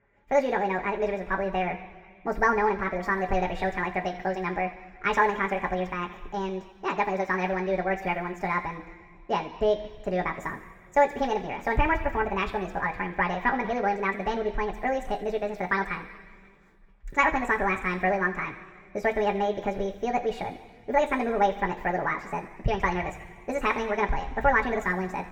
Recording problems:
wrong speed and pitch; too fast and too high; 1.7 times normal speed
room echo; noticeable; dies away in 1.5 s
muffled; slightly; fading above 3.5 kHz
off-mic speech; somewhat distant

